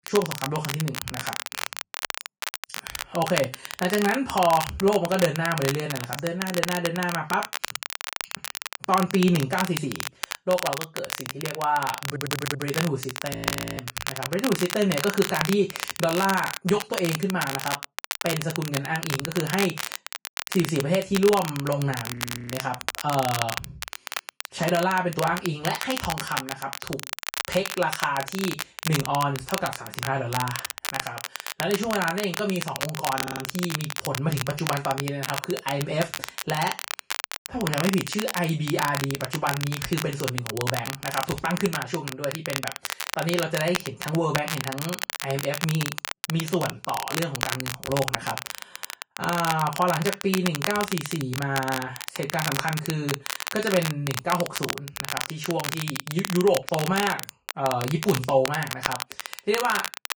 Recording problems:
off-mic speech; far
room echo; very slight; dies away in 0.2 s
garbled, watery; slightly; nothing above 11 kHz
crackle, like an old record; loud; 5 dB below the speech
audio stuttering; at 12 s and at 33 s
audio freezing; at 13 s and at 22 s

